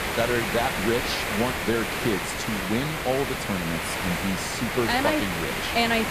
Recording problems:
hiss; loud; throughout; 1 dB below the speech

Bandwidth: 14.5 kHz